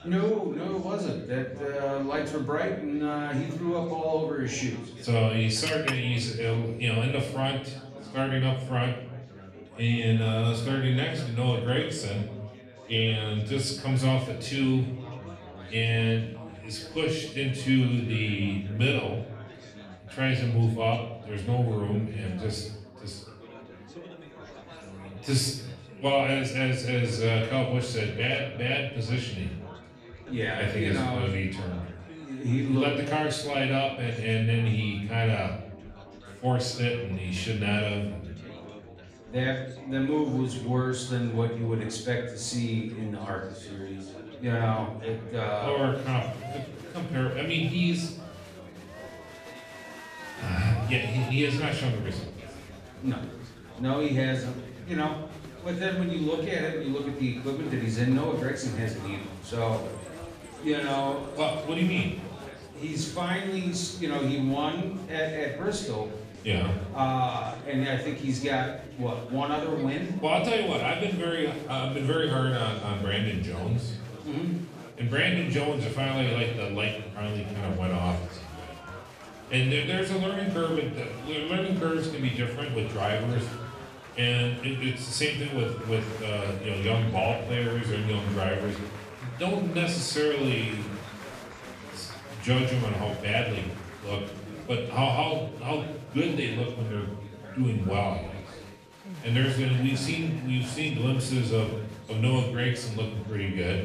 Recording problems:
off-mic speech; far
room echo; noticeable; dies away in 0.6 s
chatter from many people; noticeable; throughout; 15 dB below the speech
background music; faint; throughout; 25 dB below the speech
clattering dishes; noticeable; at 5.5 s; peak 3 dB below the speech

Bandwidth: 14.5 kHz